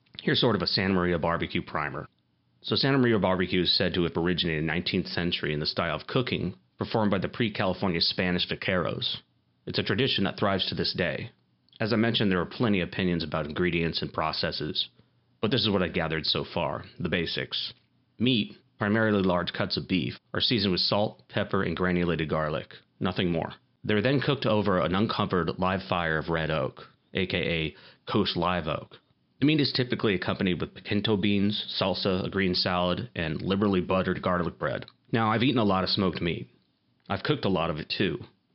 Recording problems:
high frequencies cut off; noticeable; nothing above 5.5 kHz

